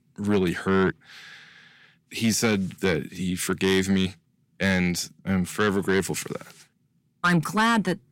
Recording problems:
distortion; slight; 10 dB below the speech

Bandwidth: 16 kHz